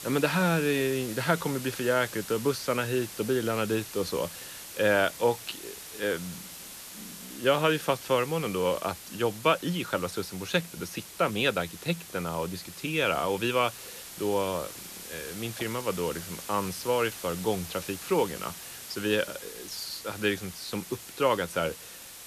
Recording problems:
hiss; noticeable; throughout; 10 dB below the speech

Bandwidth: 14 kHz